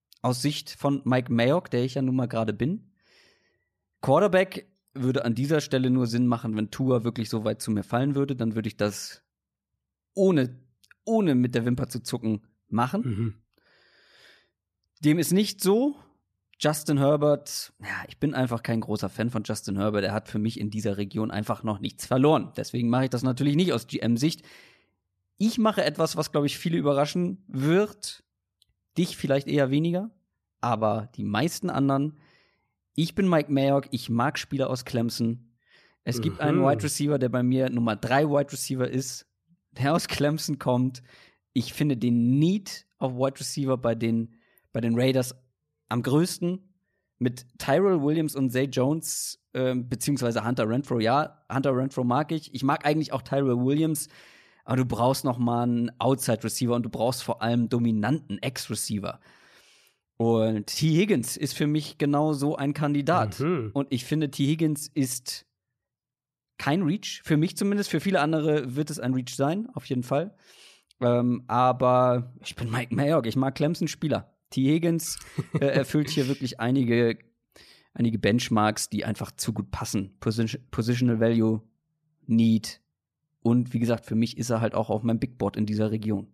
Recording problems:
none

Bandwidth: 14.5 kHz